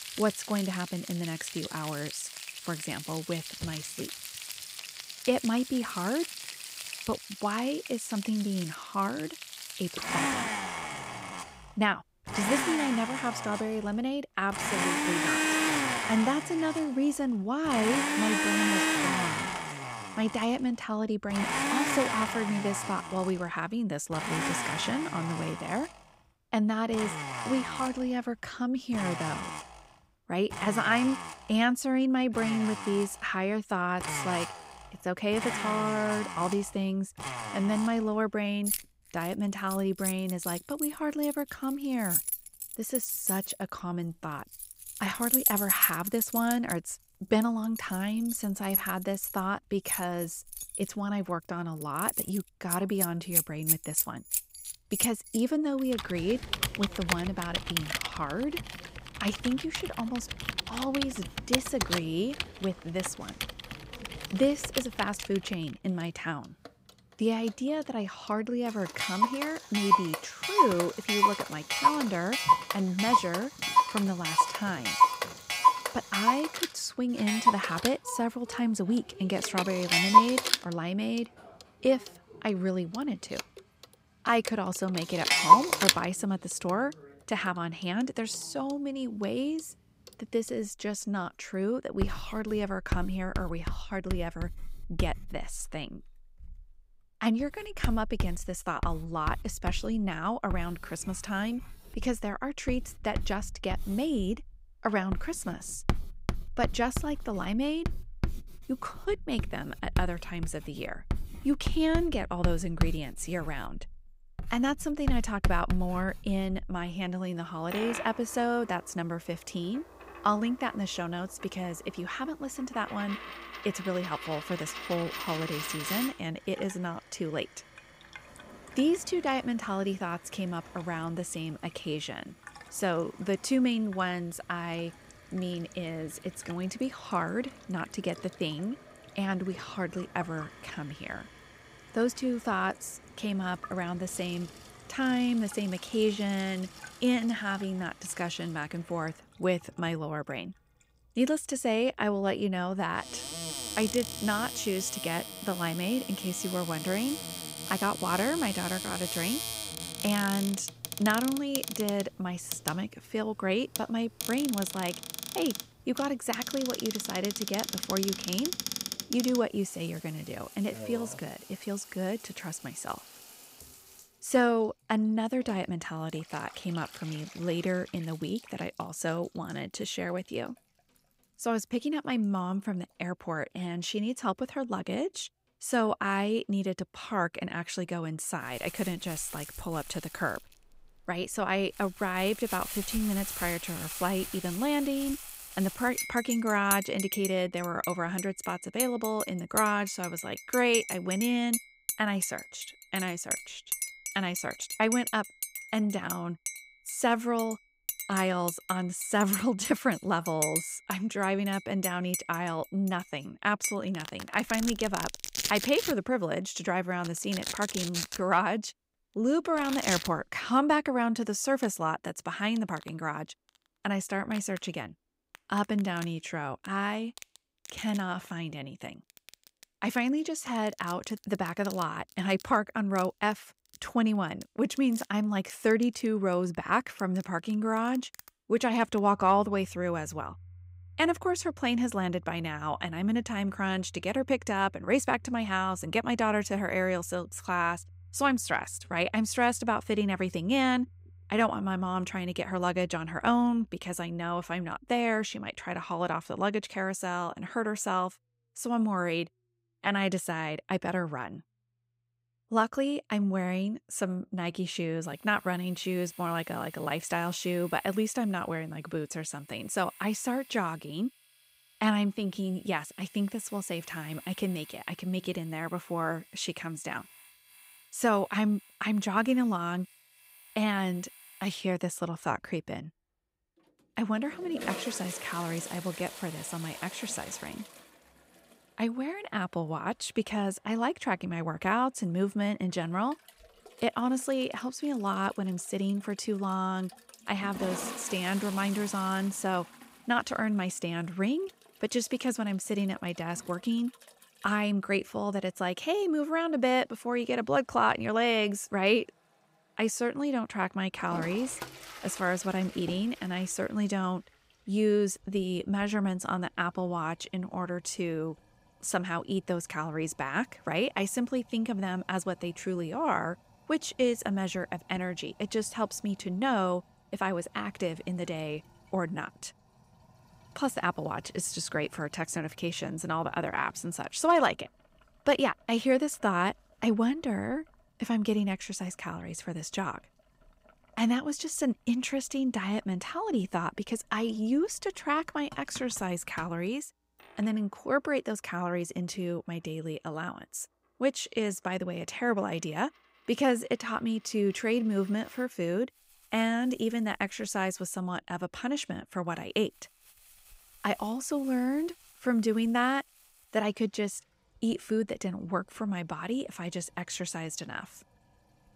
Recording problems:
household noises; loud; throughout; 2 dB below the speech

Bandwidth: 15.5 kHz